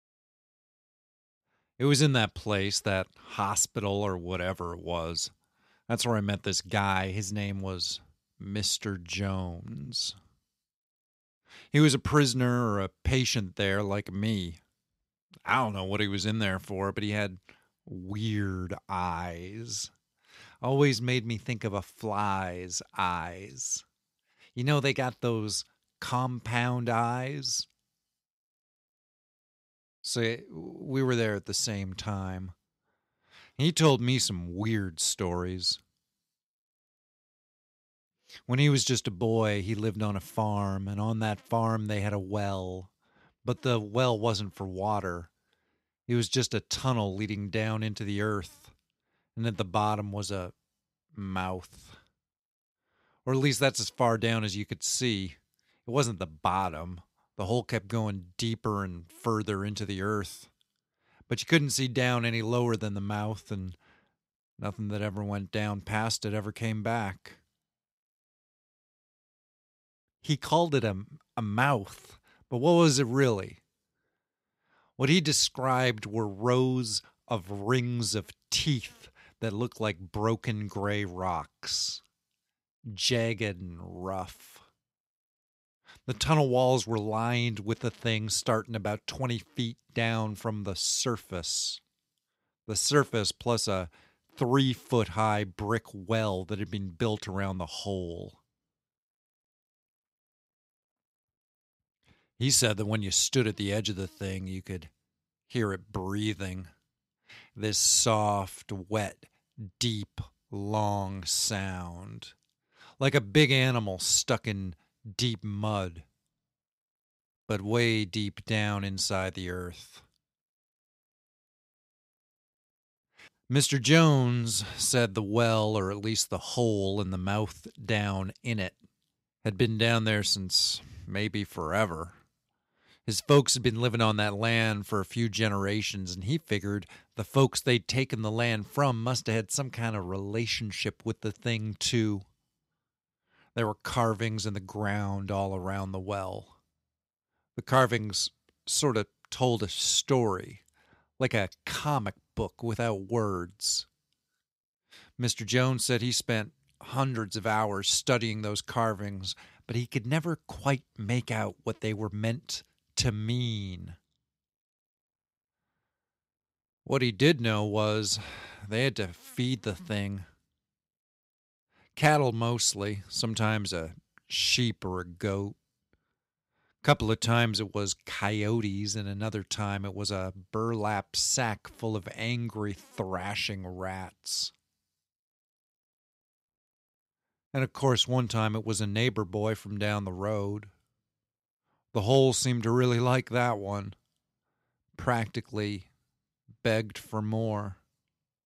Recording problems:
none

